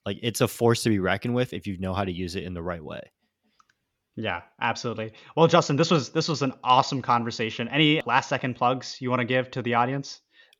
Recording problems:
none

